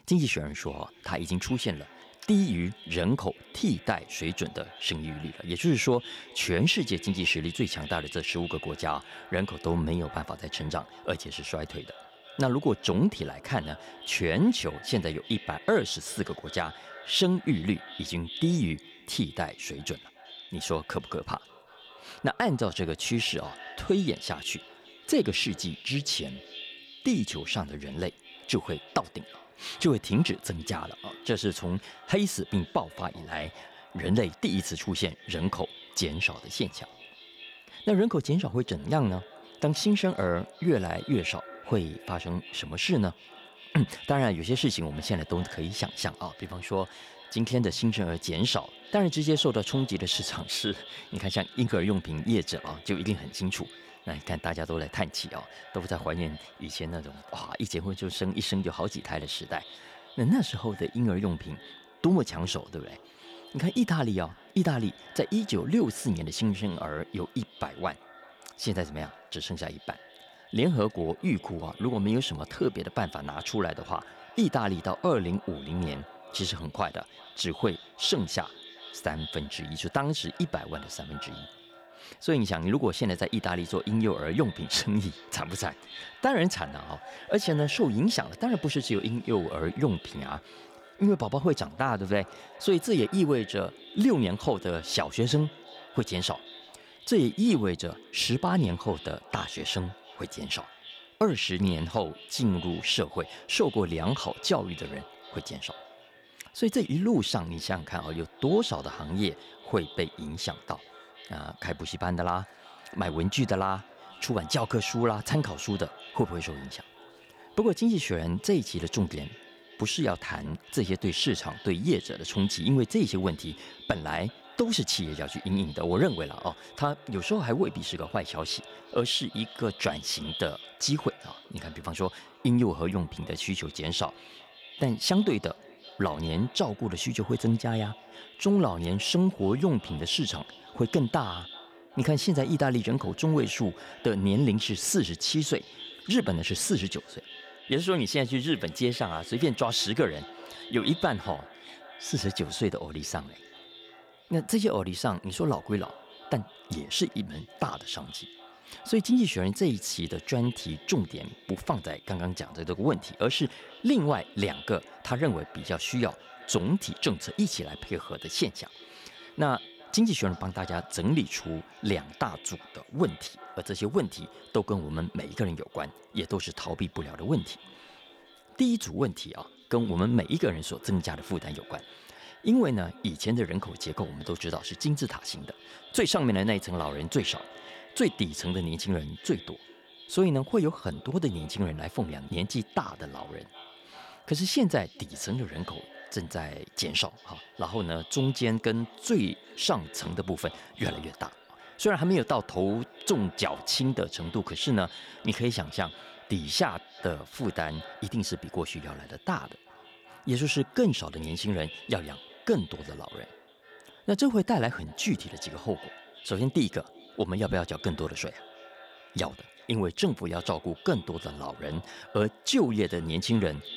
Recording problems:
echo of what is said; noticeable; throughout; 380 ms later, 20 dB below the speech

